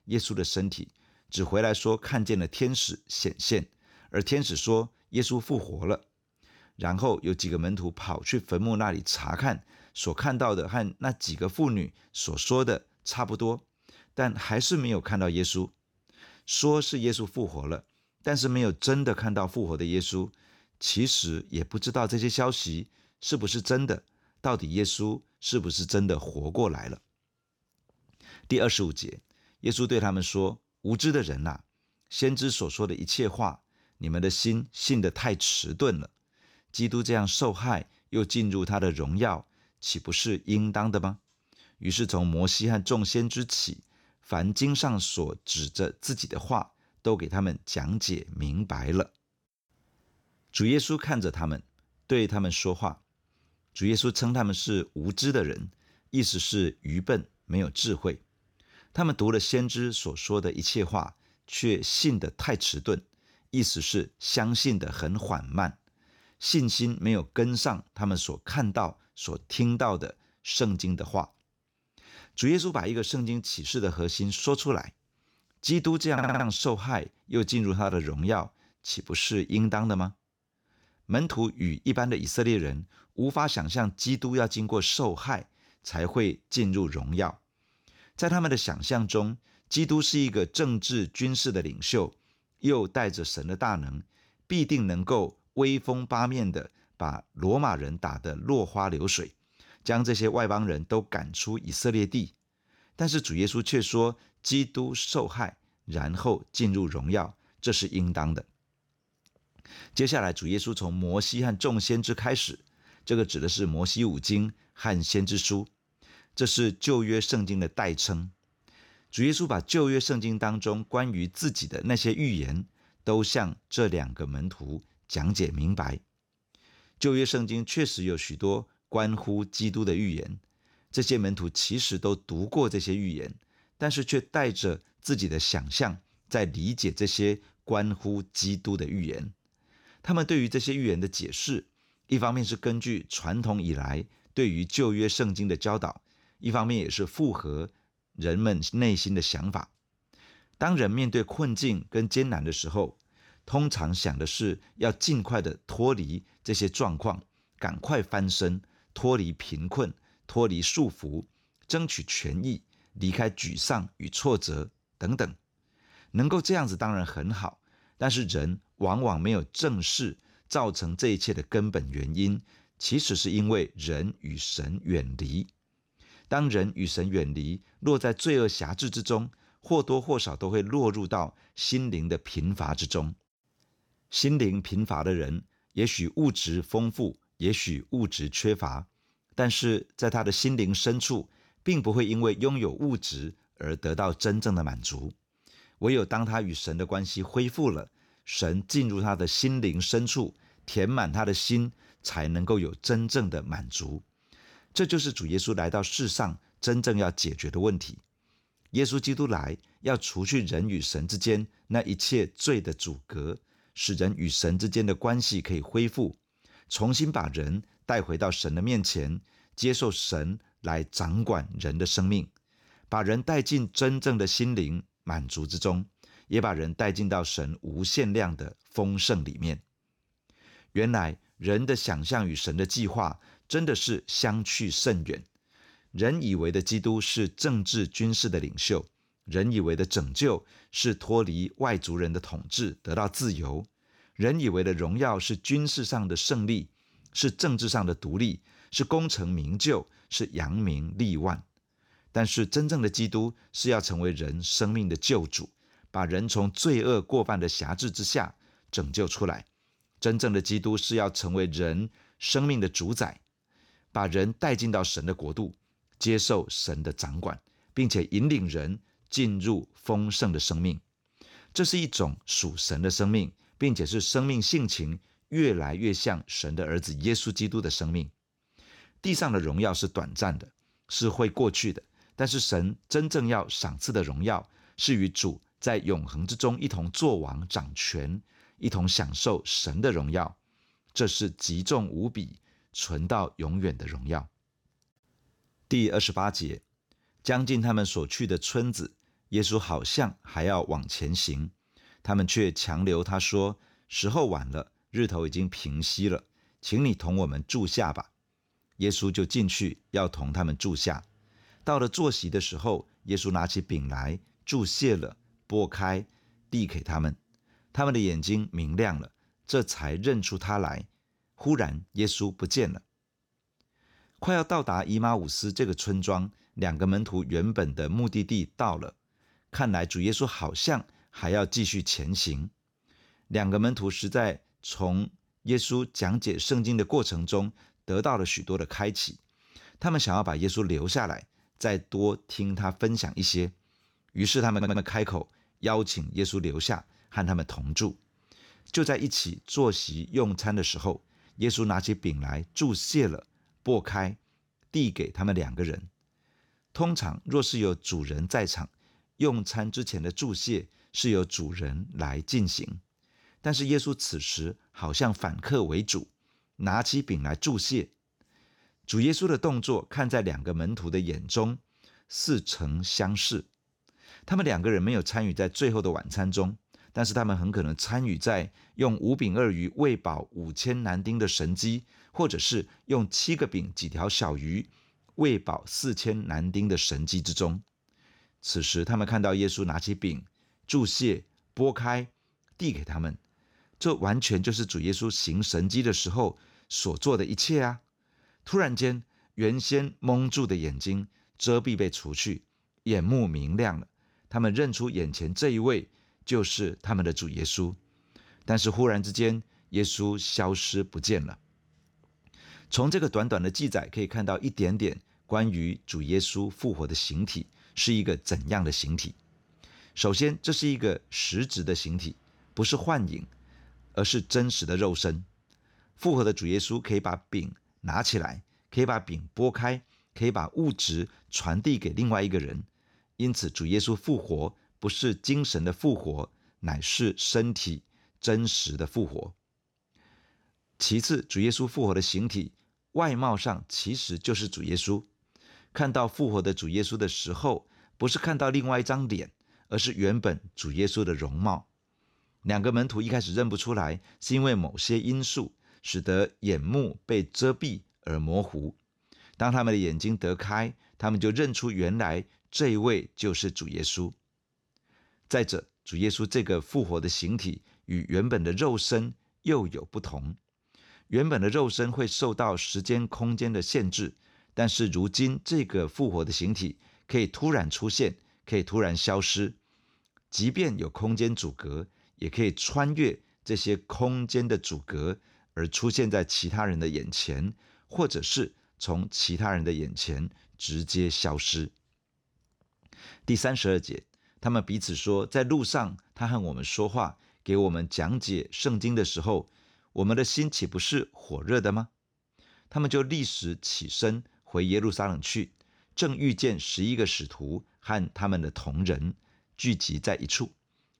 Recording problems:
audio stuttering; at 1:16 and at 5:45

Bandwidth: 18.5 kHz